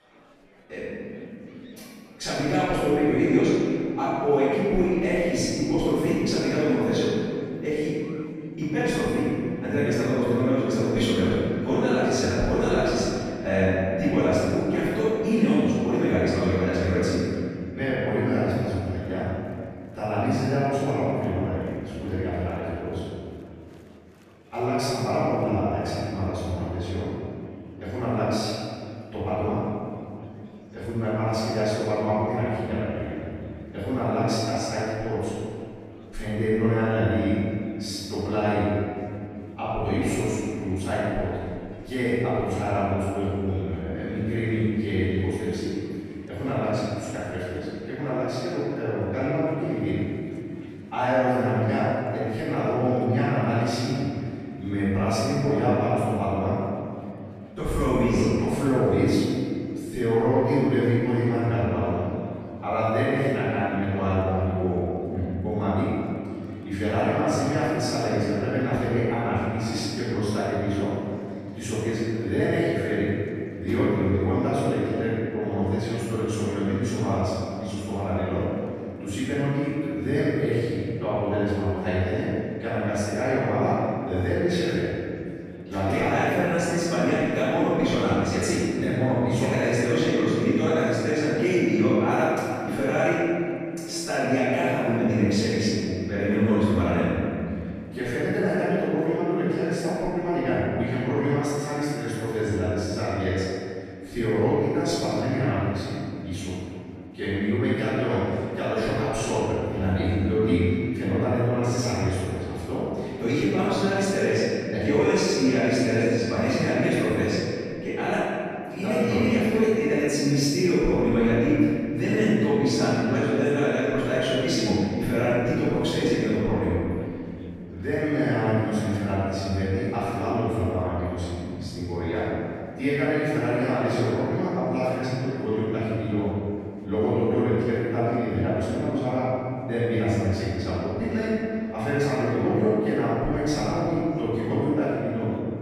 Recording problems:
room echo; strong; dies away in 2.5 s
off-mic speech; far
murmuring crowd; faint; throughout; 30 dB below the speech

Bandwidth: 14.5 kHz